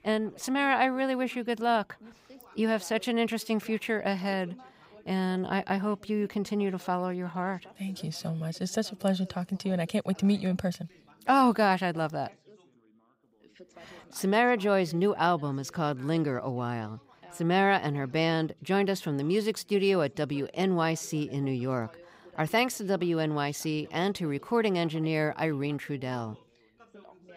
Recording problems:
background chatter; faint; throughout; 3 voices, 25 dB below the speech

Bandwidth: 15.5 kHz